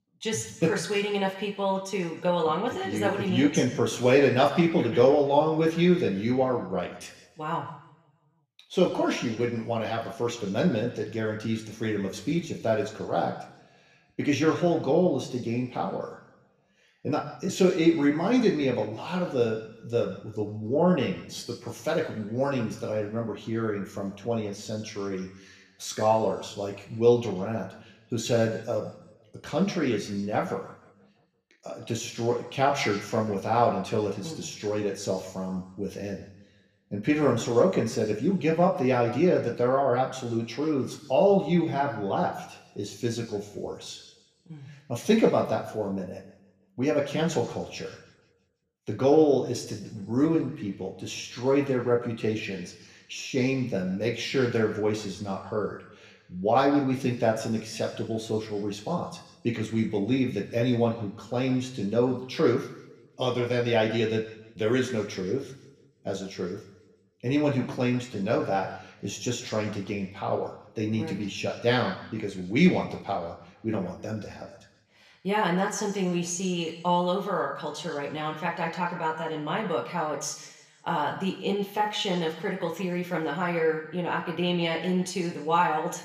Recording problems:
room echo; slight; dies away in 1 s
off-mic speech; somewhat distant

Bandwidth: 15 kHz